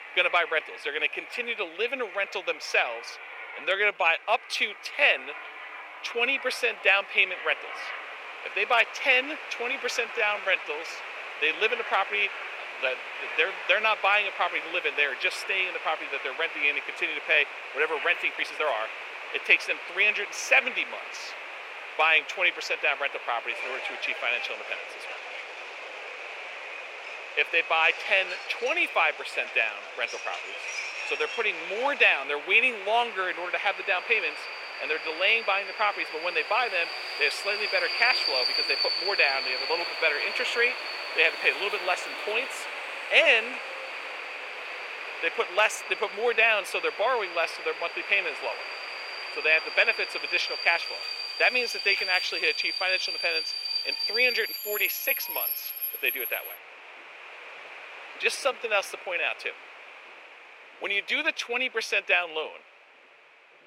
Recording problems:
thin; very; fading below 450 Hz
train or aircraft noise; loud; throughout; 8 dB below the speech
uneven, jittery; strongly; from 3.5 to 59 s

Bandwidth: 16 kHz